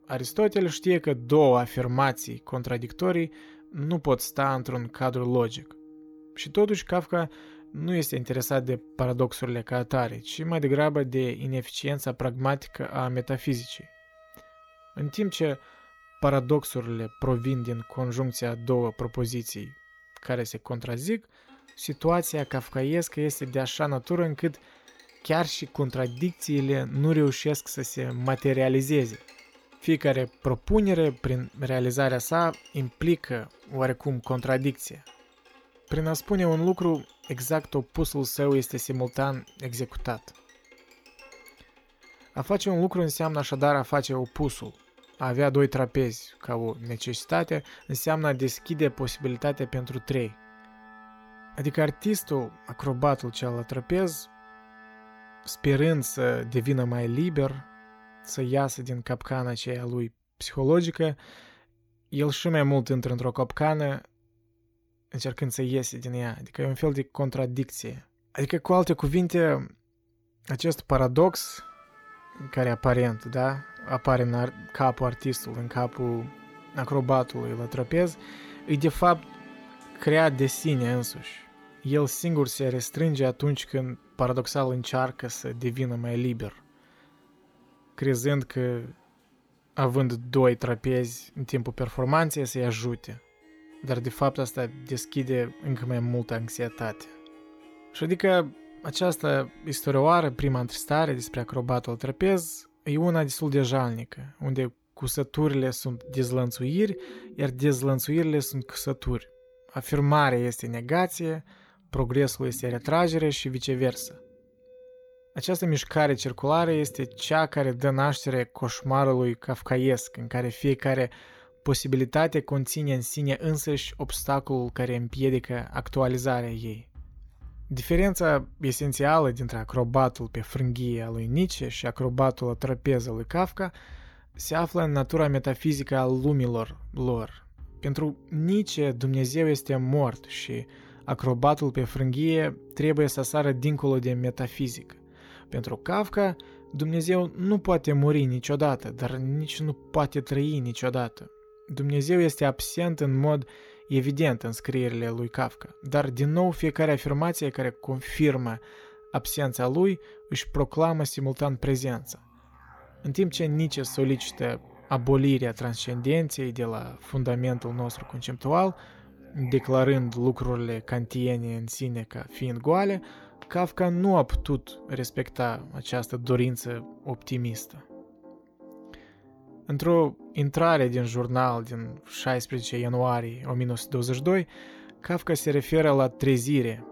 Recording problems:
background music; faint; throughout; 25 dB below the speech

